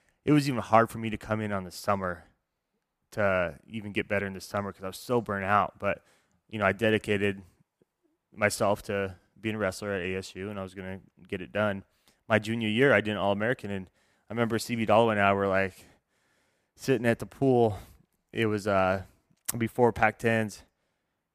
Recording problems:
none

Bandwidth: 15 kHz